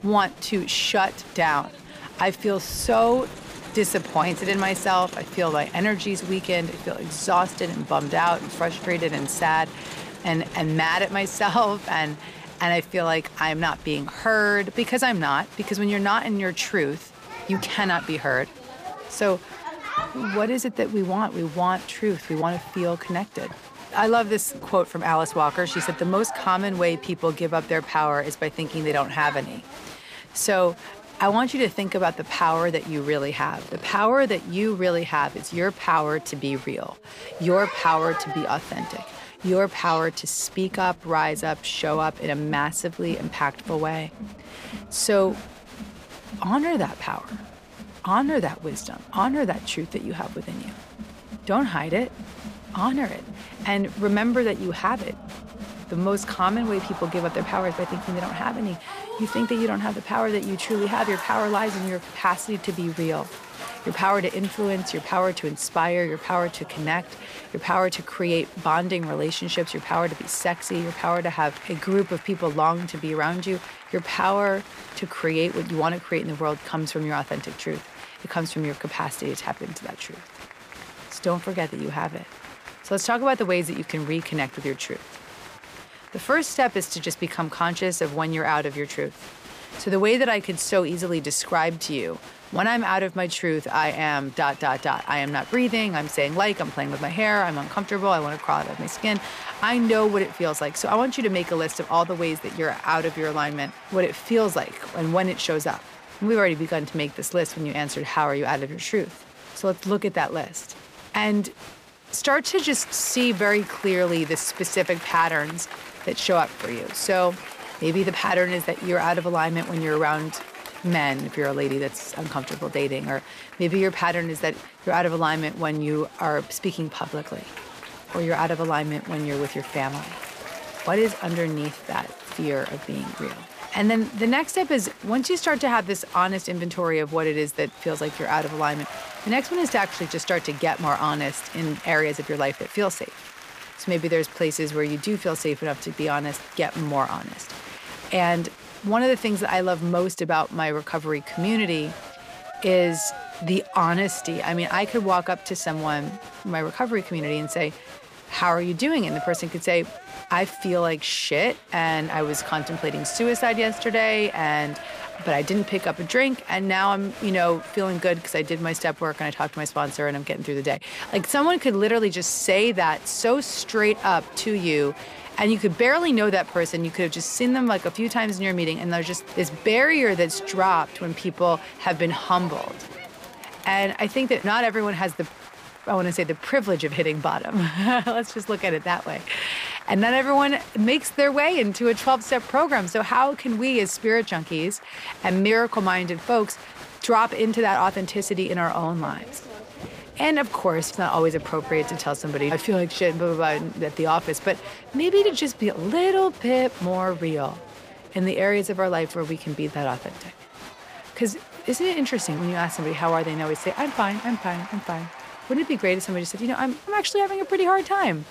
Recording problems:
crowd noise; noticeable; throughout; 15 dB below the speech

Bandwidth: 15 kHz